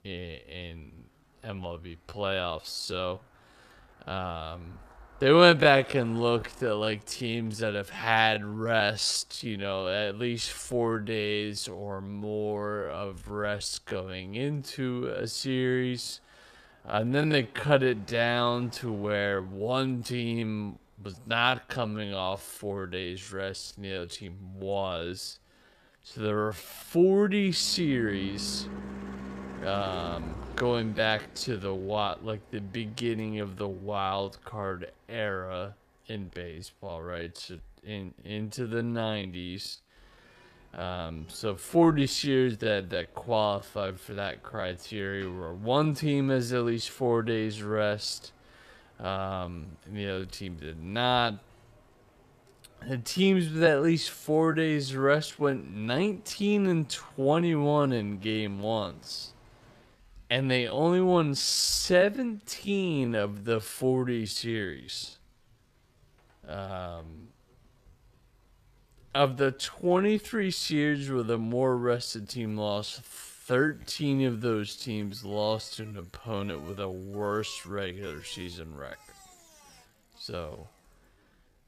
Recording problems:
wrong speed, natural pitch; too slow; 0.6 times normal speed
traffic noise; faint; throughout; 20 dB below the speech

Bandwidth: 14.5 kHz